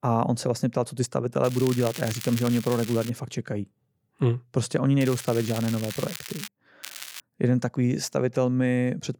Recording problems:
crackling; noticeable; from 1.5 to 3 s, from 5 to 6.5 s and at 7 s; 10 dB below the speech

